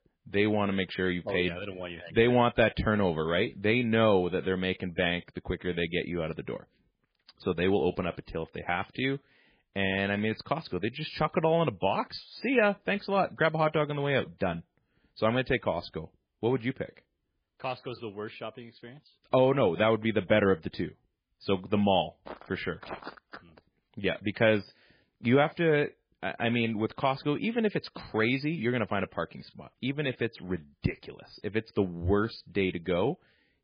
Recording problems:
garbled, watery; badly
footsteps; faint; from 22 to 24 s; peak 15 dB below the speech

